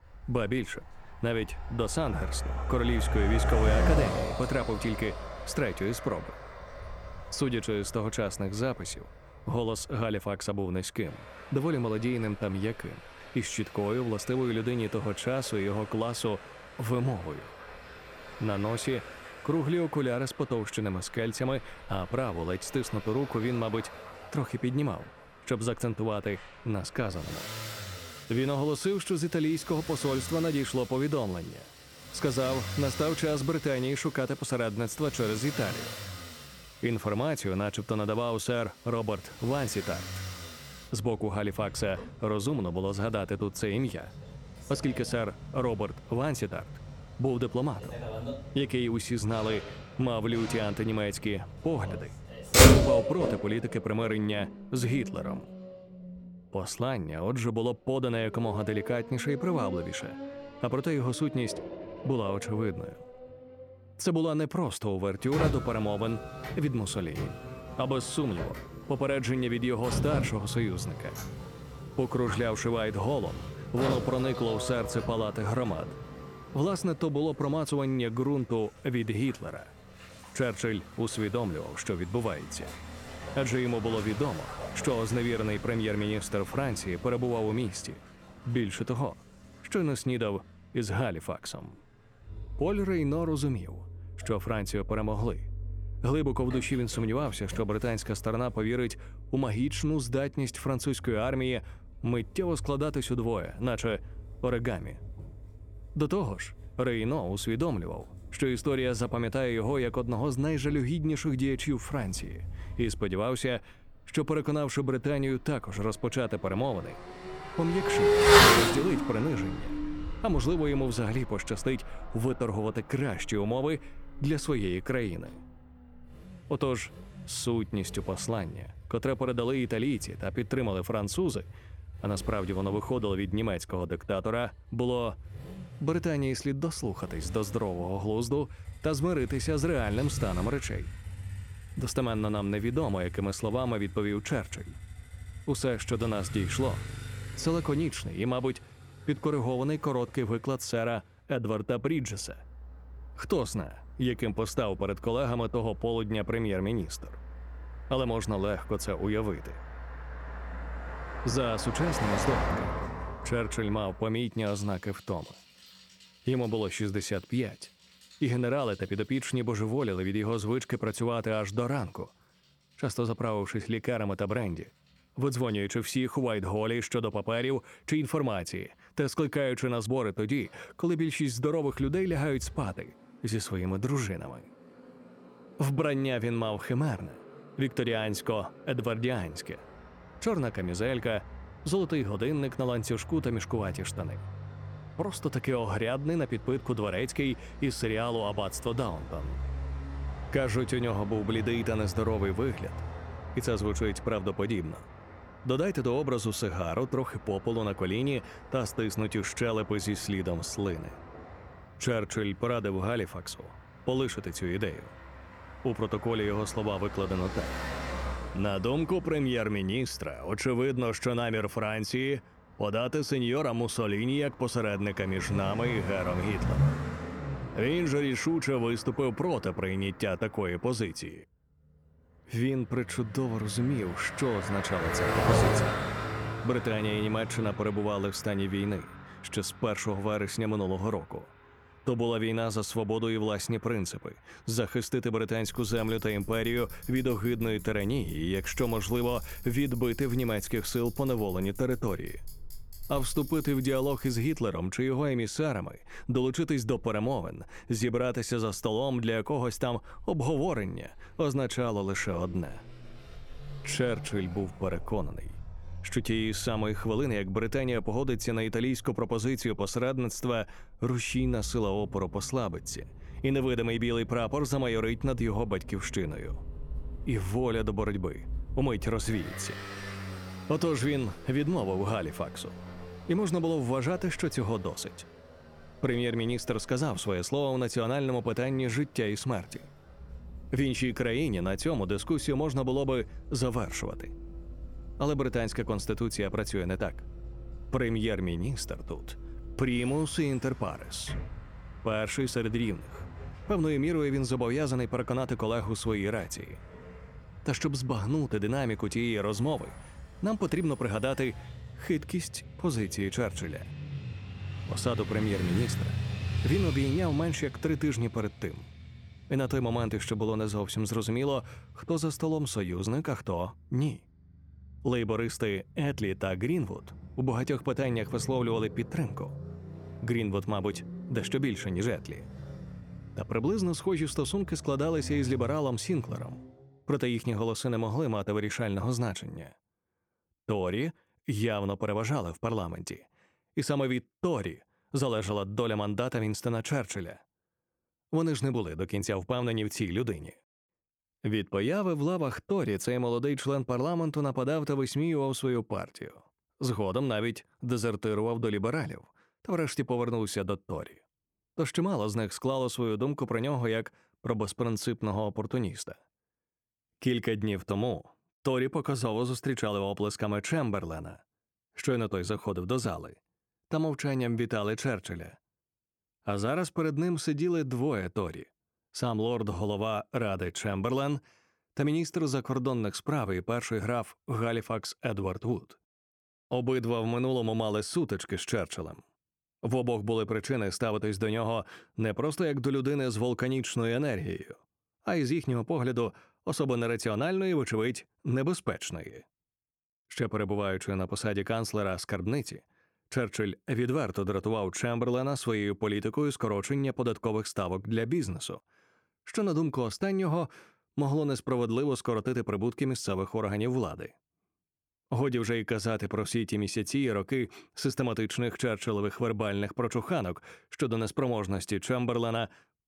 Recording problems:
traffic noise; loud; until 5:36; 6 dB below the speech

